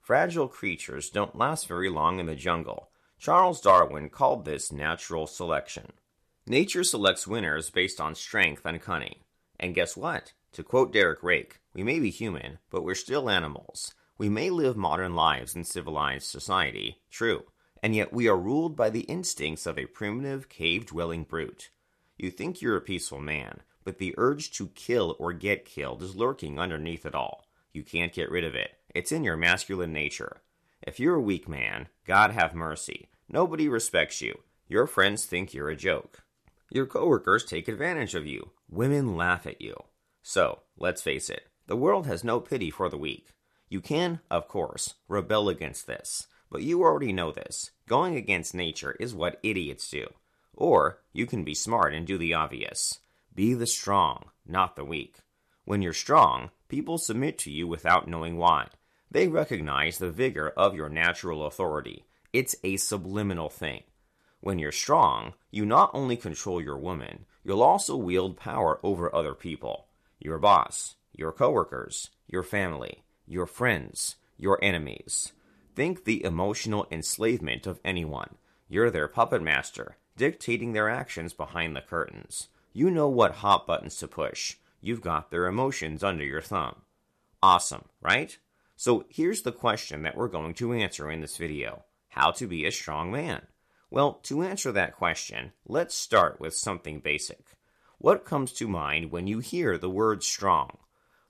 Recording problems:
none

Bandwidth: 13.5 kHz